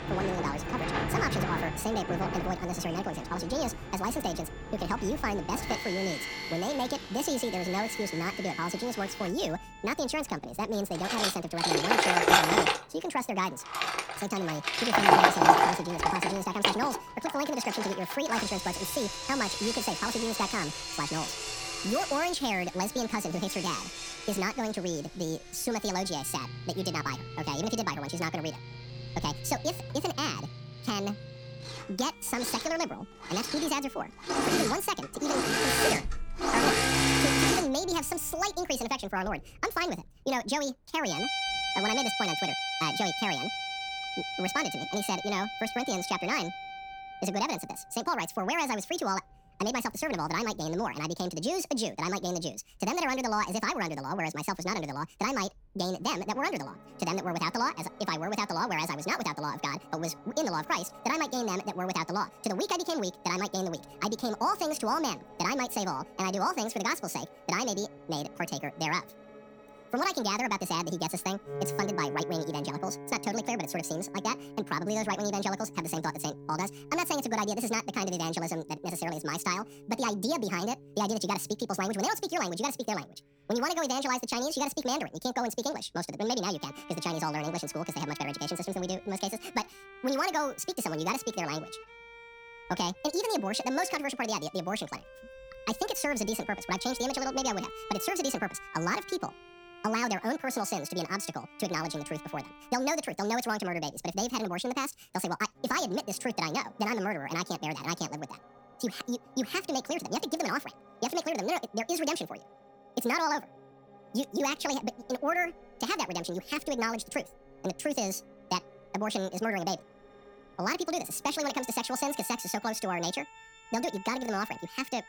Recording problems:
wrong speed and pitch; too fast and too high; 1.6 times normal speed
machinery noise; very loud; until 38 s; 3 dB above the speech
background music; noticeable; throughout; 10 dB below the speech
wind in the background; faint; throughout; 25 dB below the speech

